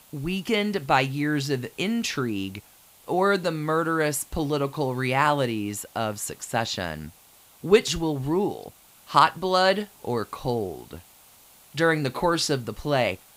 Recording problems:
hiss; faint; throughout; 25 dB below the speech

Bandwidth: 15.5 kHz